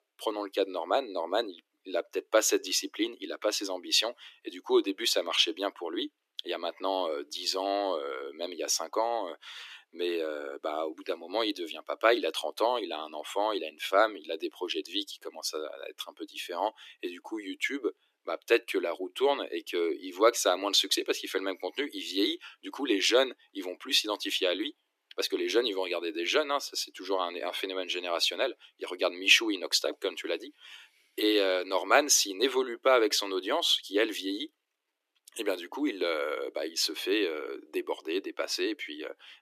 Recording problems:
thin; somewhat; fading below 300 Hz

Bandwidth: 14.5 kHz